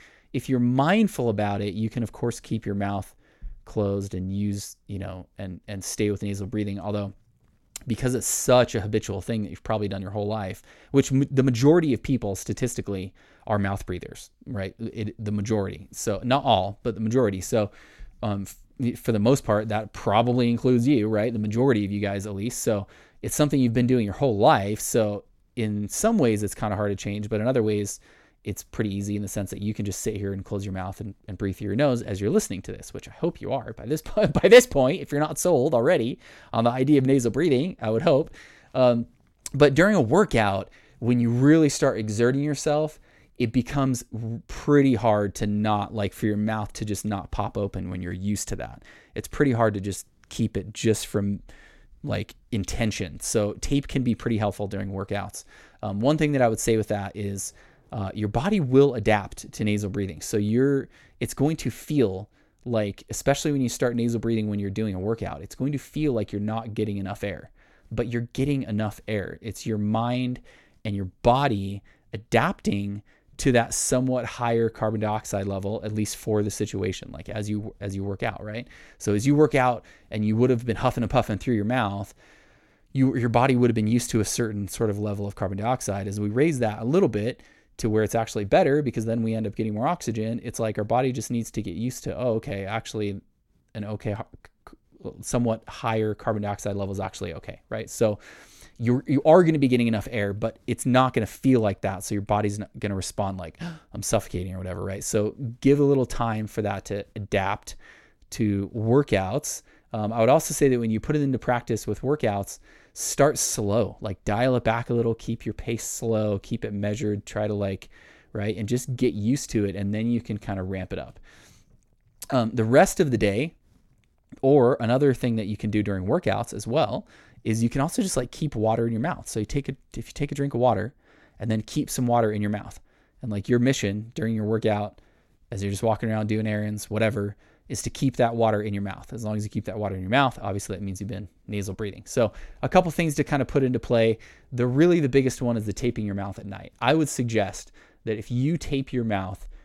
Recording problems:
none

